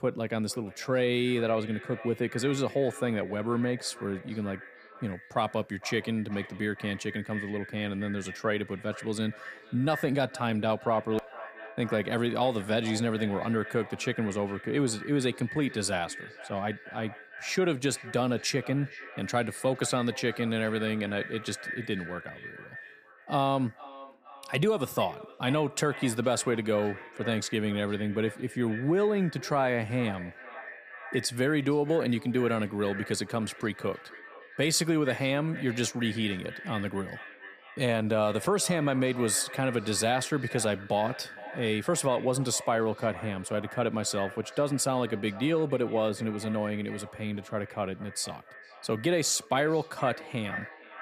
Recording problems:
echo of what is said; noticeable; throughout; 460 ms later, 15 dB below the speech

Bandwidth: 15 kHz